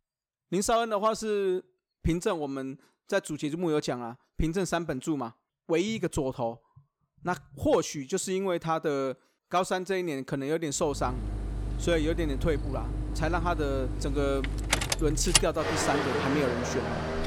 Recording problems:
traffic noise; loud; from 11 s on; 1 dB below the speech

